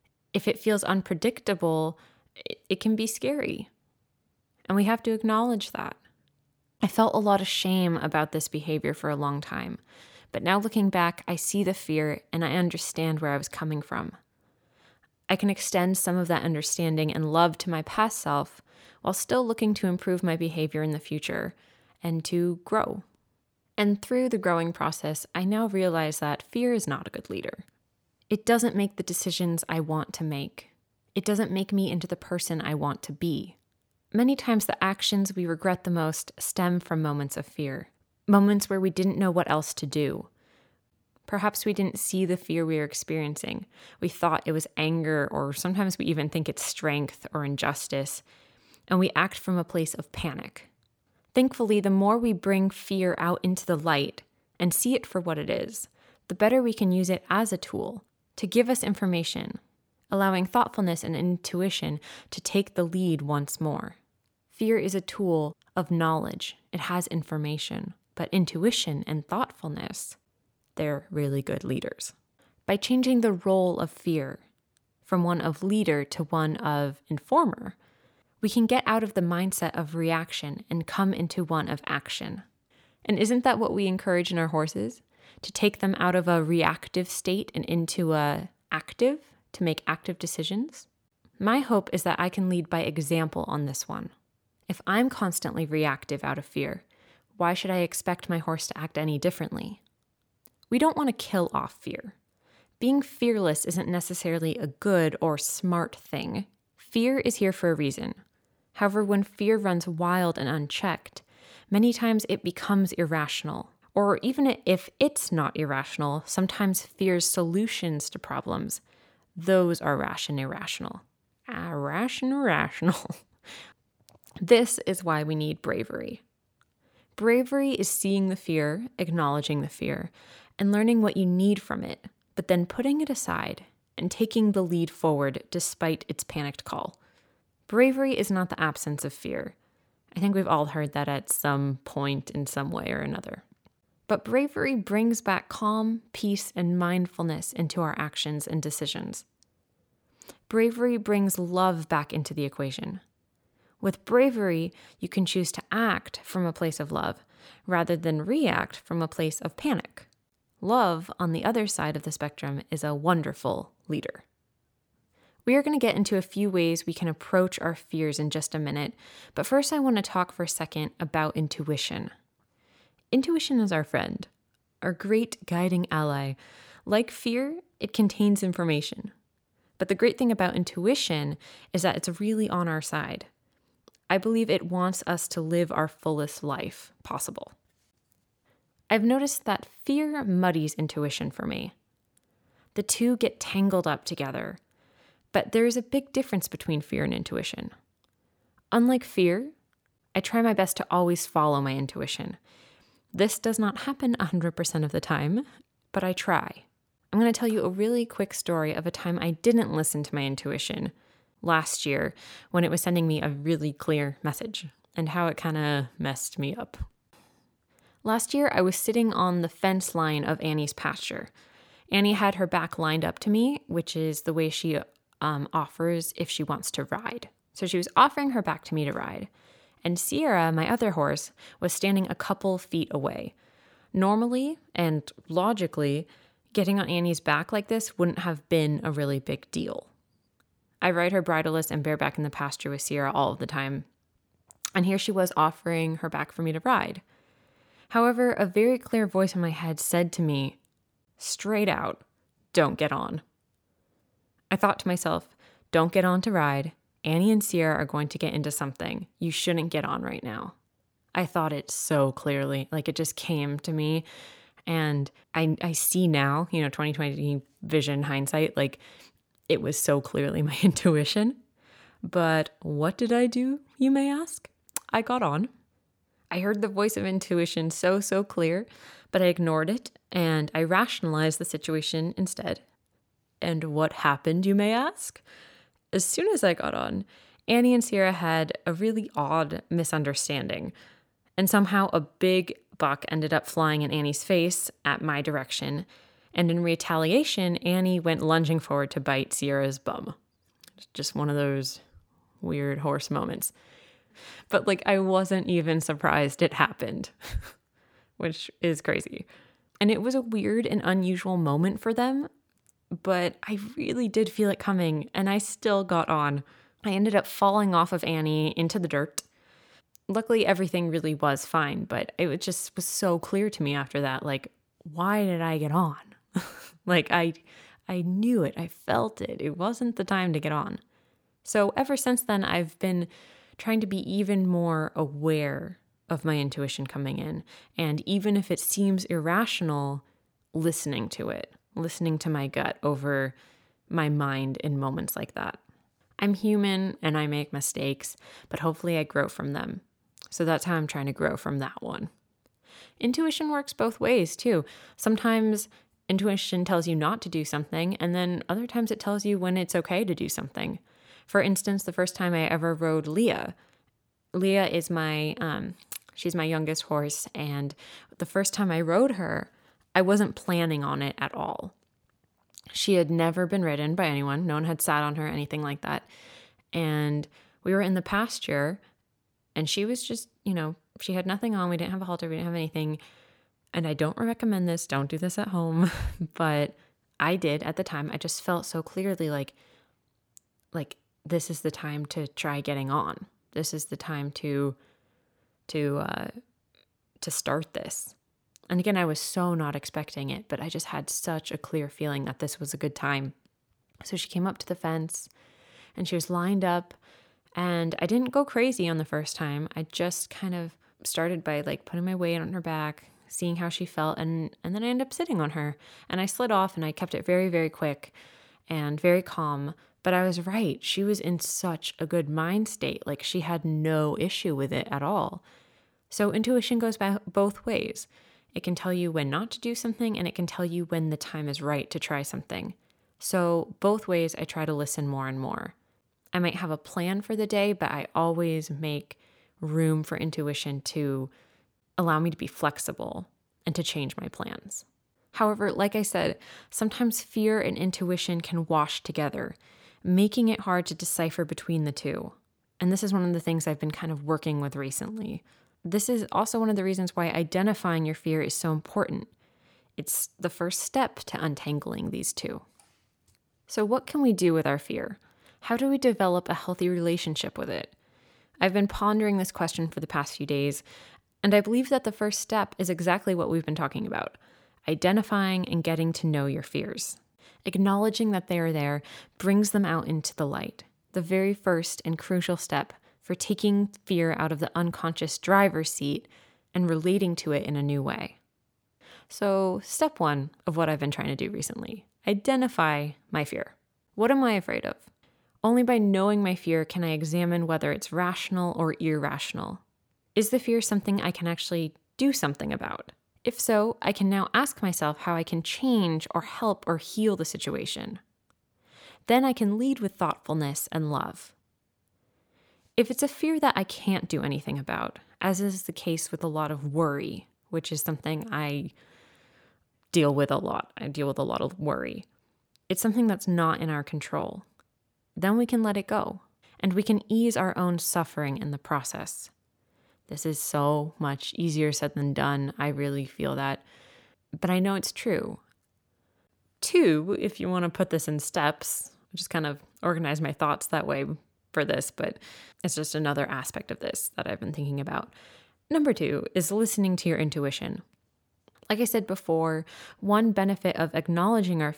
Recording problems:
none

